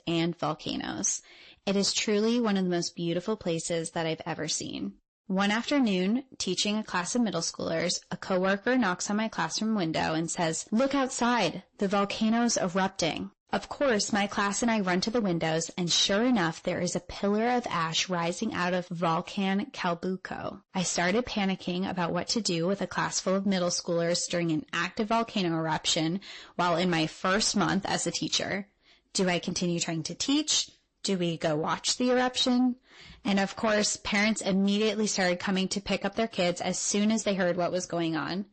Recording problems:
distortion; slight; 10 dB below the speech
garbled, watery; slightly; nothing above 8 kHz

